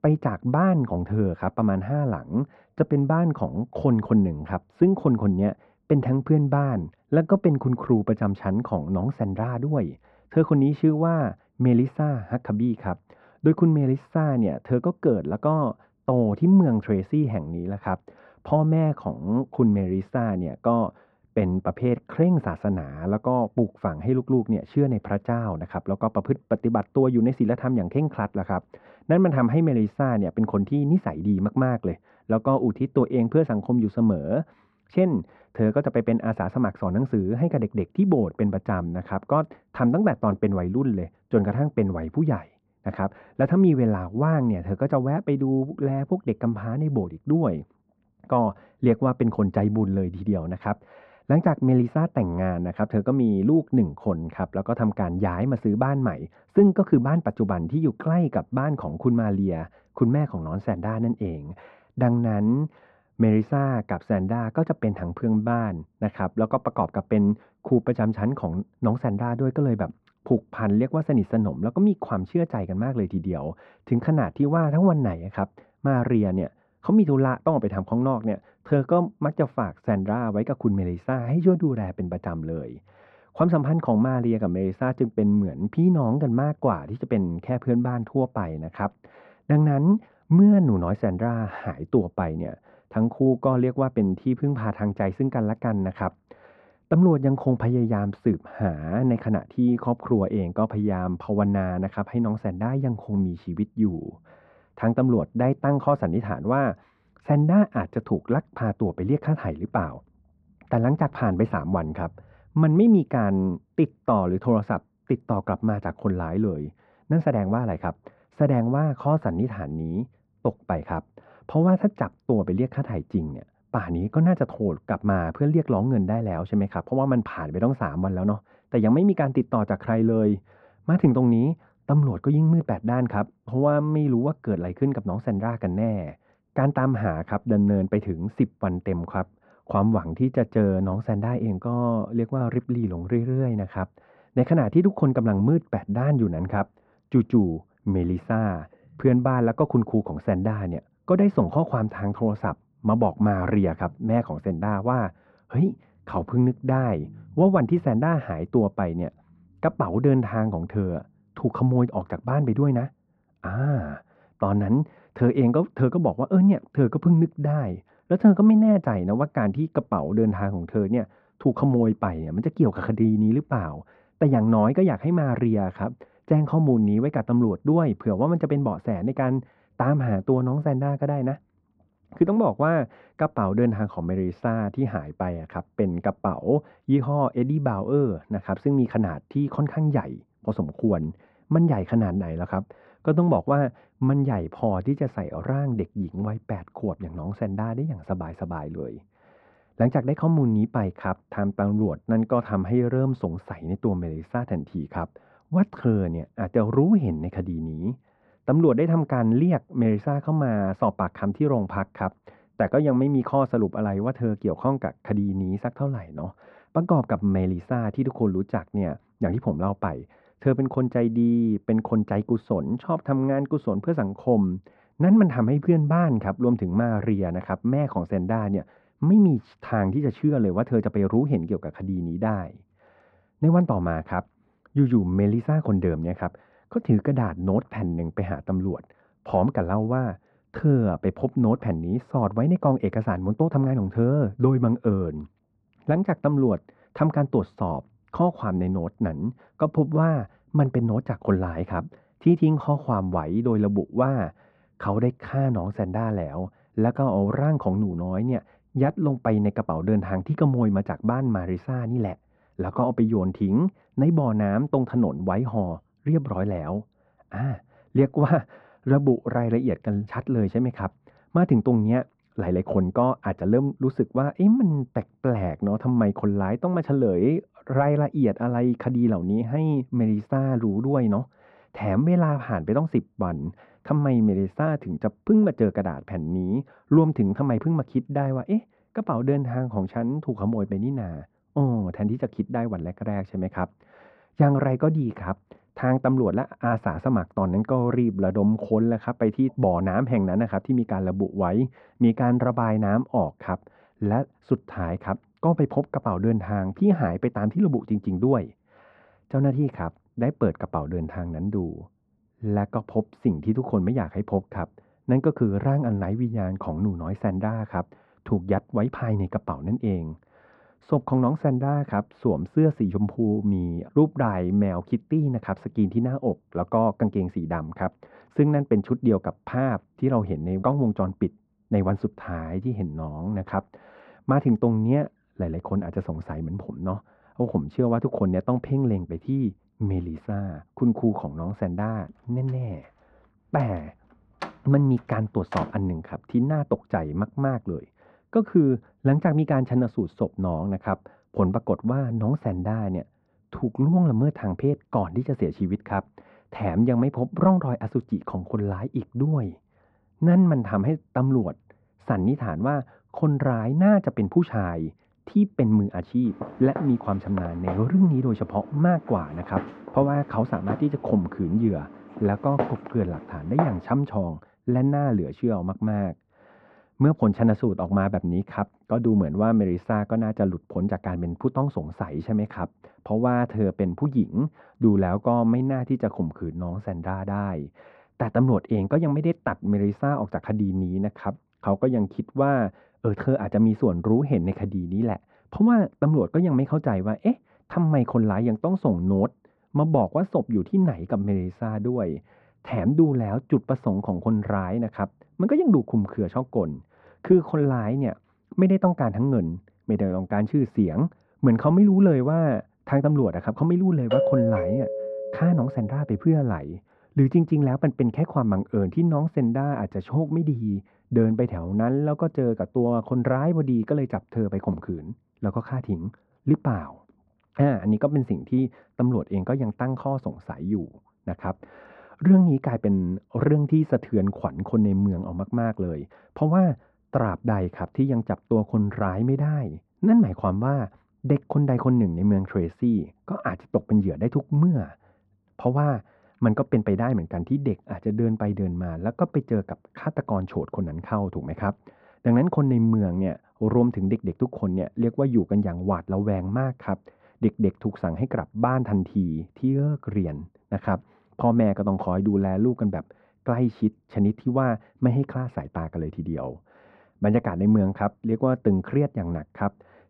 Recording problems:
muffled; very; fading above 1 kHz
door banging; faint; from 5:44 to 5:46; peak 10 dB below the speech
footsteps; noticeable; from 6:06 to 6:14; peak 5 dB below the speech
doorbell; loud; from 6:54 to 6:56; peak 1 dB above the speech

